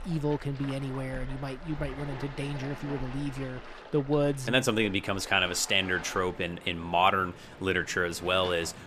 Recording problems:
rain or running water; noticeable; throughout; 15 dB below the speech

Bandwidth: 14.5 kHz